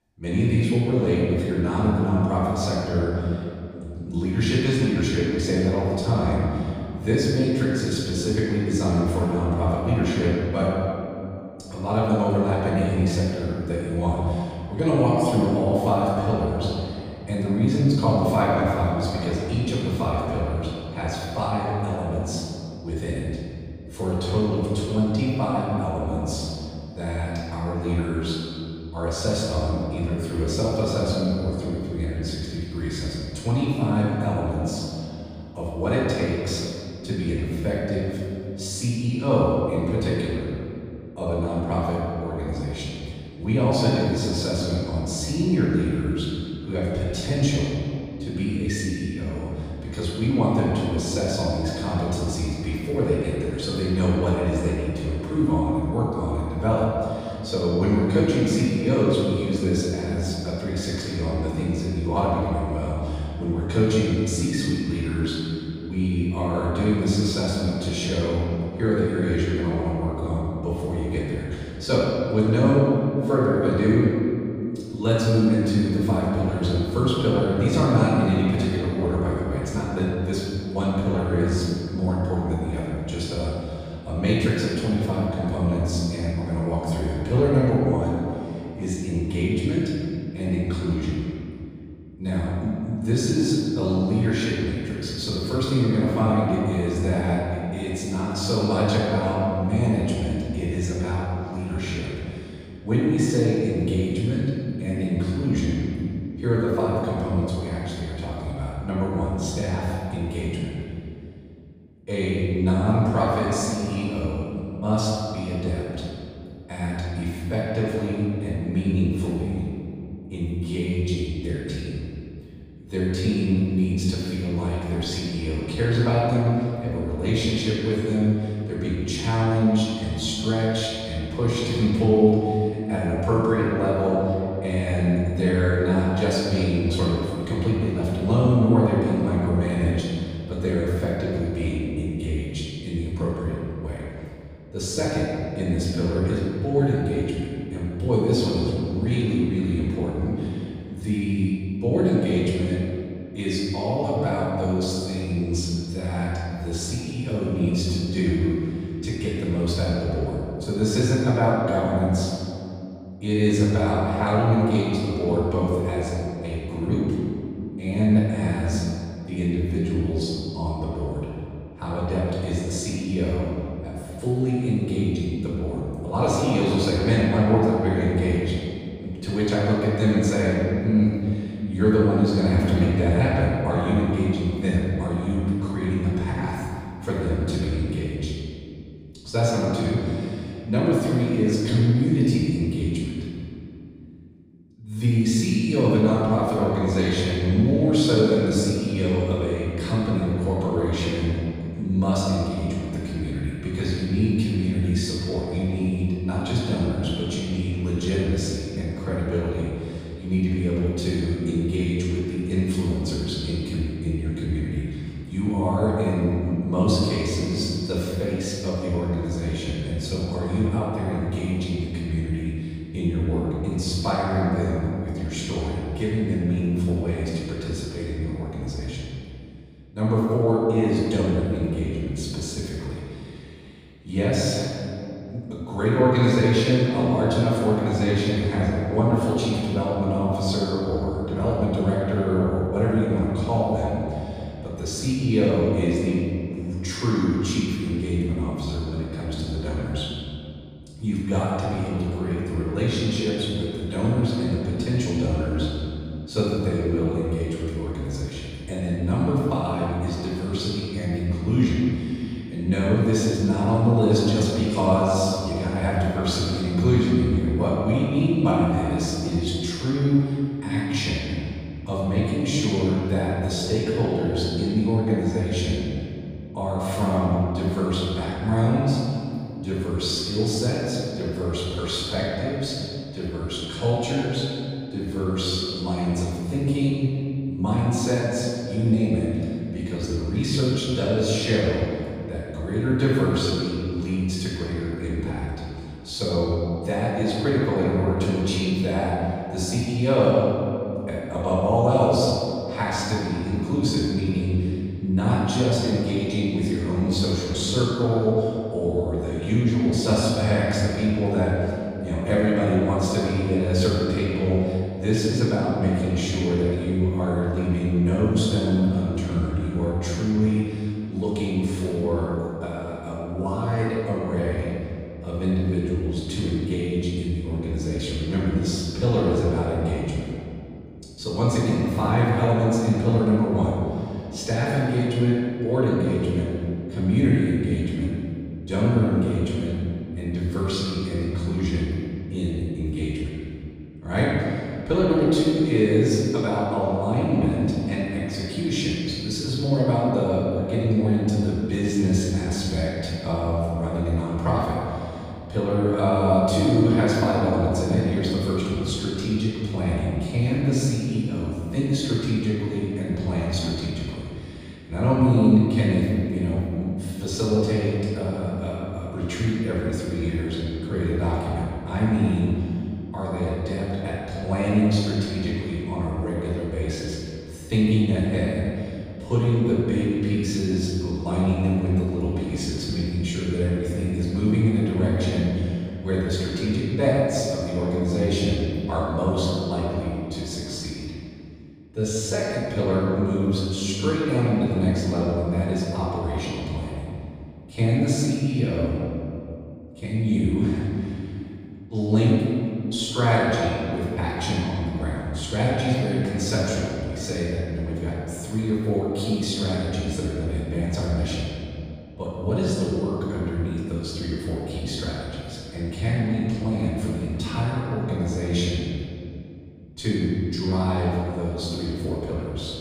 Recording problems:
room echo; strong; dies away in 2.4 s
off-mic speech; far

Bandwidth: 15 kHz